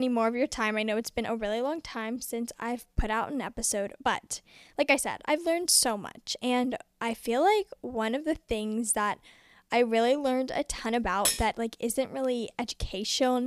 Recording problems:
abrupt cut into speech; at the start and the end
uneven, jittery; strongly; from 1 to 13 s
clattering dishes; loud; at 11 s; peak 1 dB above the speech

